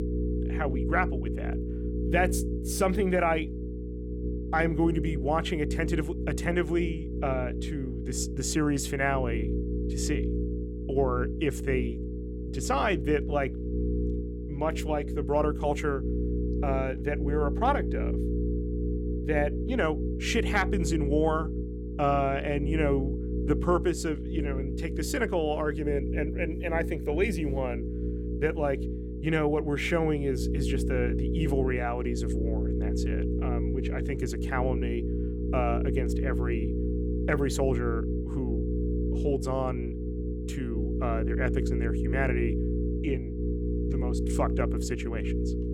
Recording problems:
electrical hum; loud; throughout; 60 Hz, 8 dB below the speech

